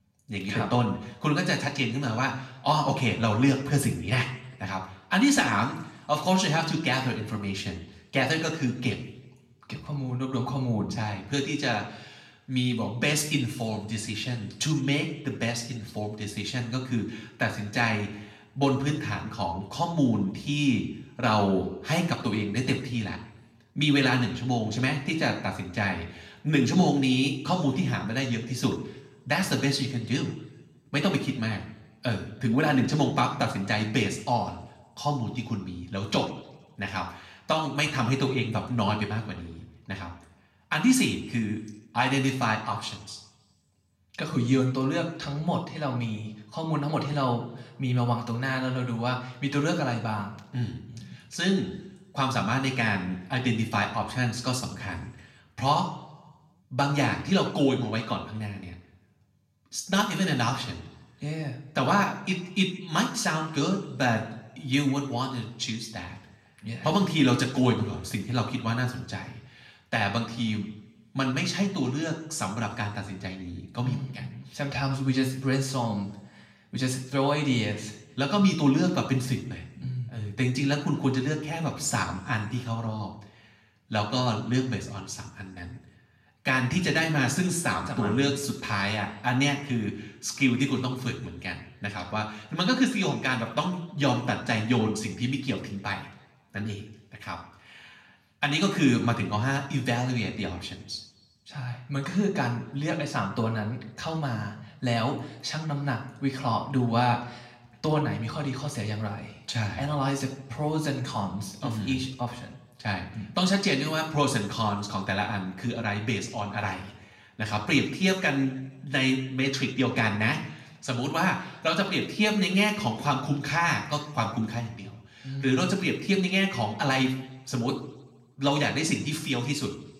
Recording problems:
room echo; slight; dies away in 0.7 s
off-mic speech; somewhat distant

